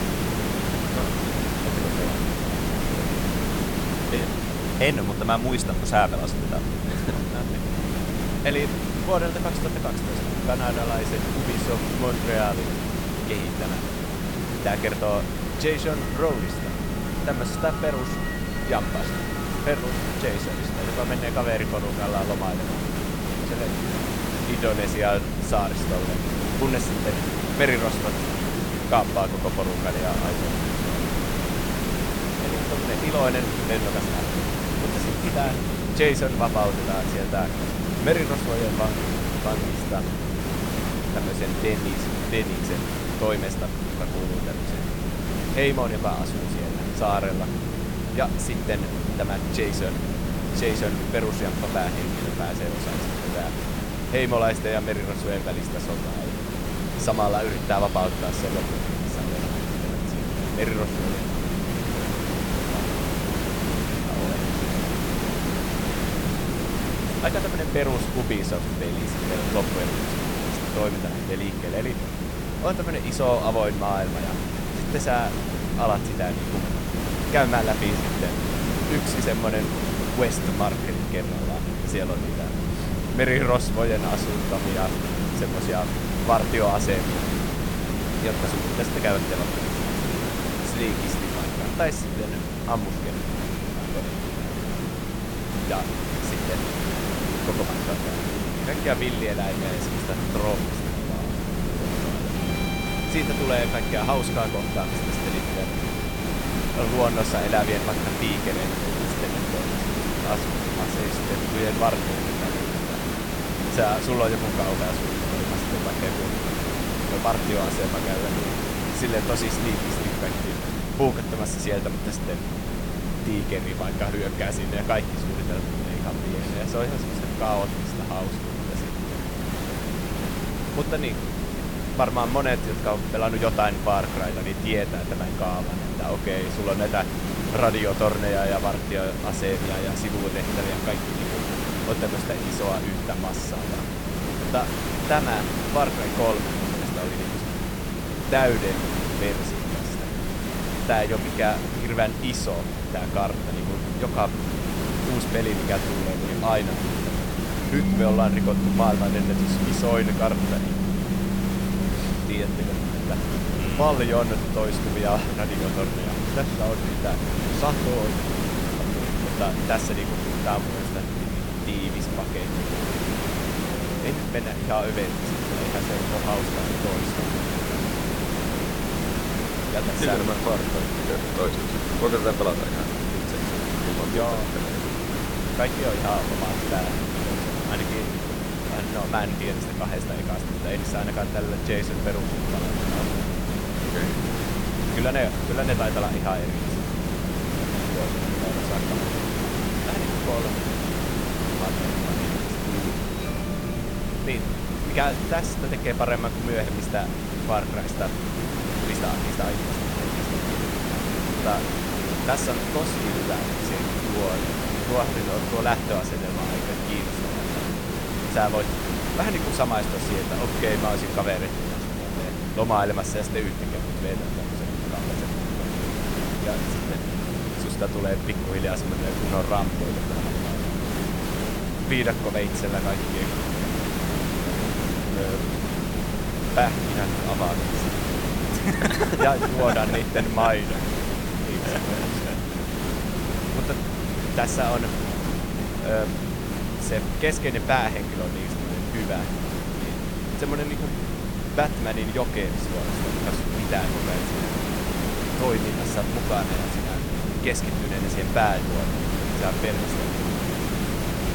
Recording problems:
background music; loud; throughout; 10 dB below the speech
hiss; loud; throughout; 2 dB below the speech
low rumble; loud; throughout; 10 dB below the speech

